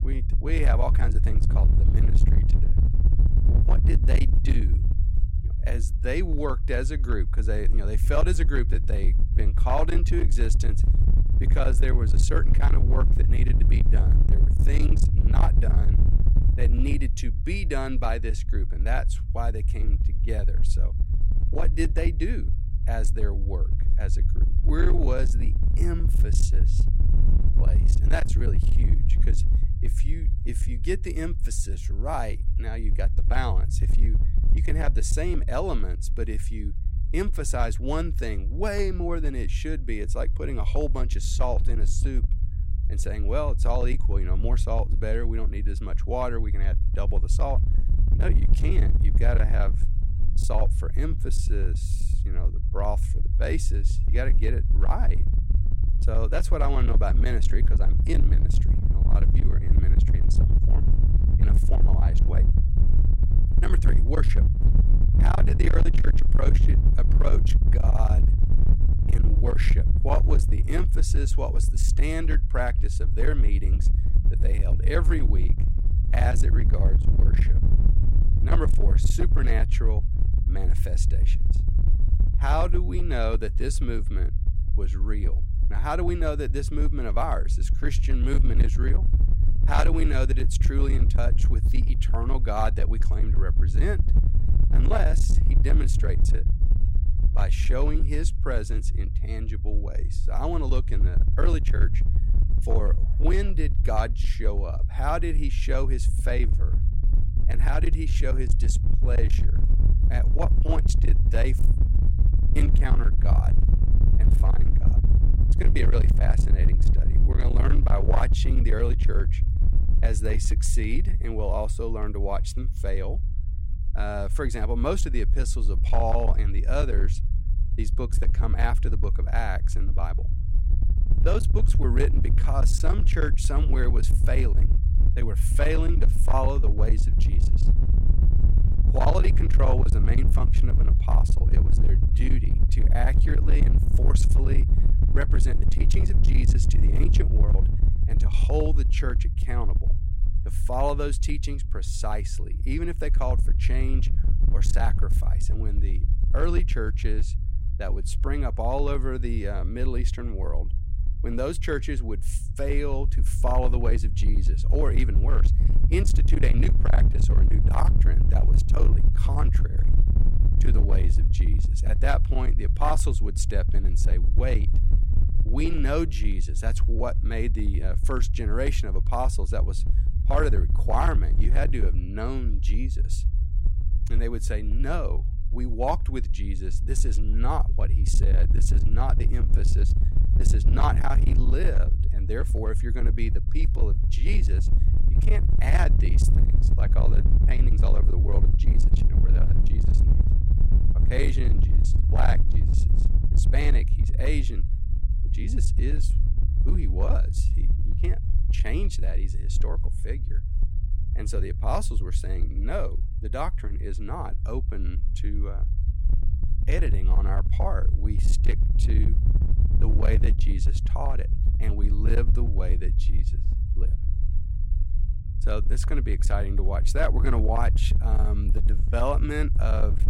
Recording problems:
distortion; slight; 13% of the sound clipped
low rumble; loud; throughout; 8 dB below the speech

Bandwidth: 16 kHz